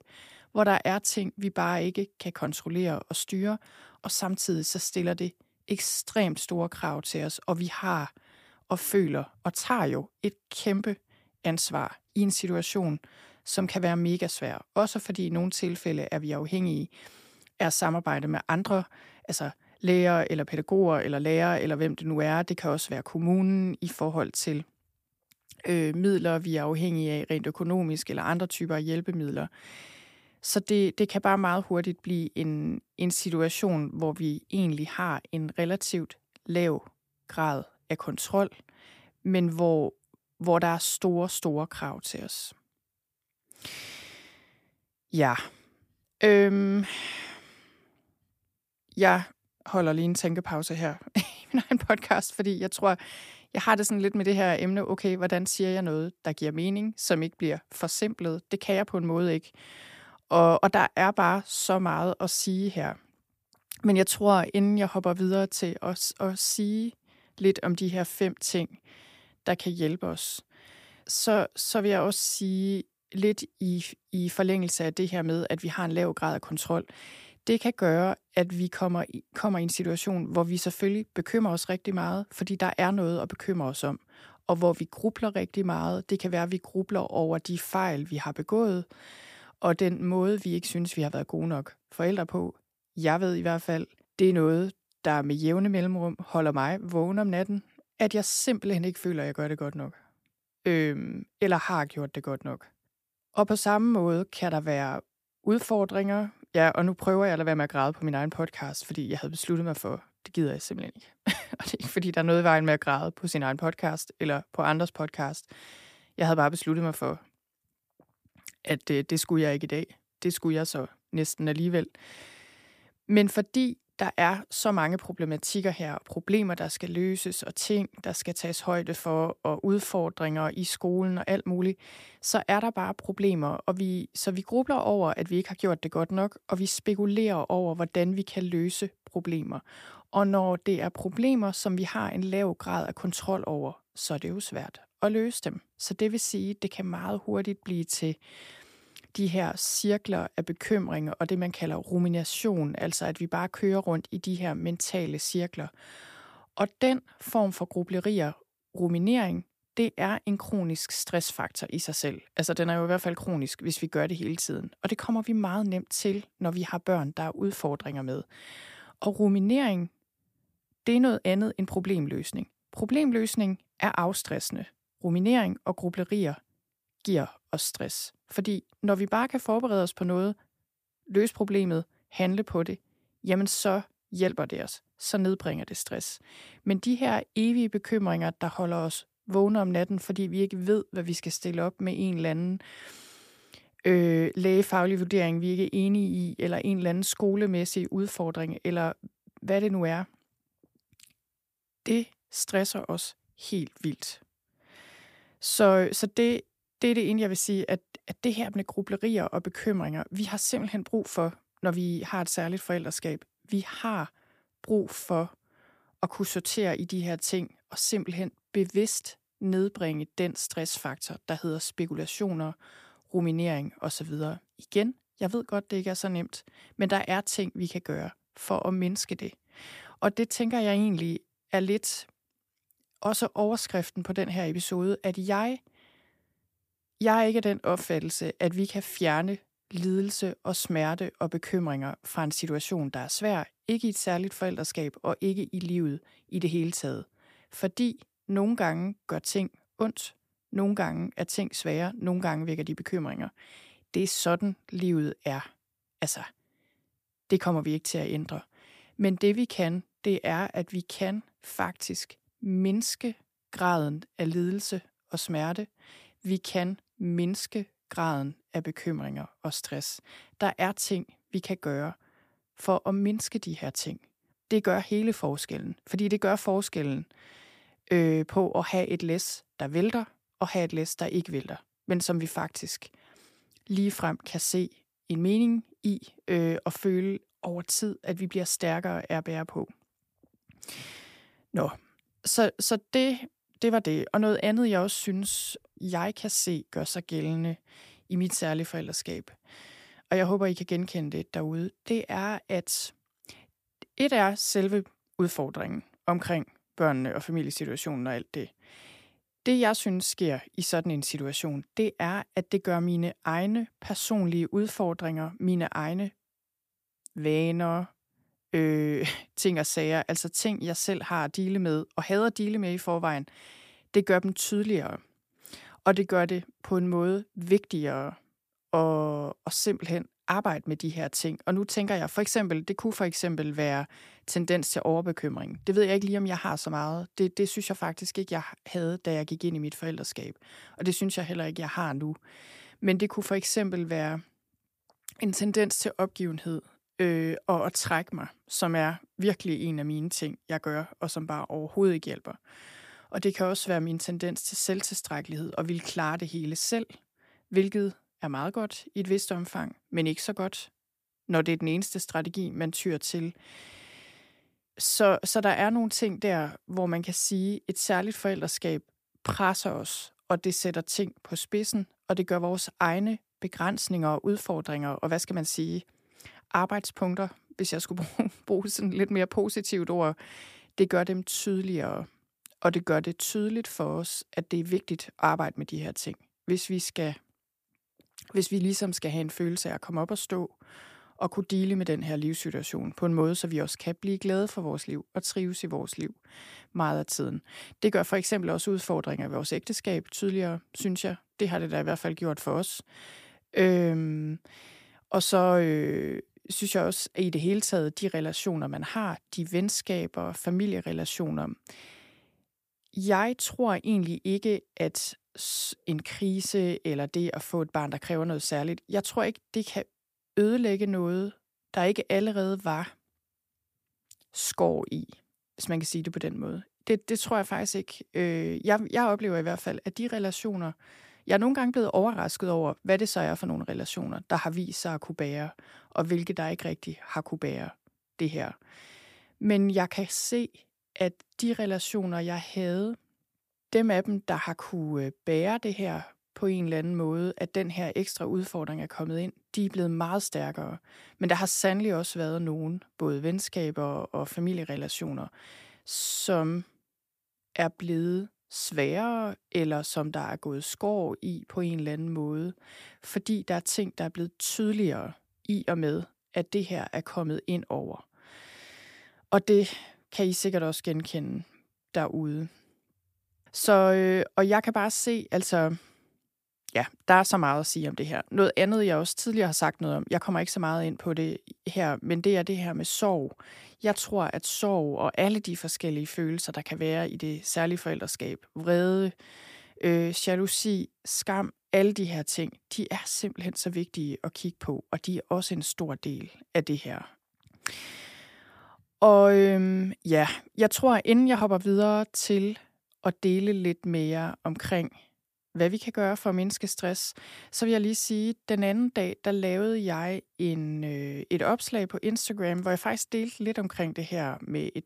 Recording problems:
none

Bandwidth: 15 kHz